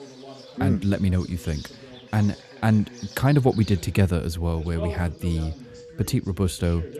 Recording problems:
voice in the background; noticeable; throughout; 20 dB below the speech
animal sounds; faint; throughout; 20 dB below the speech

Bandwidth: 13.5 kHz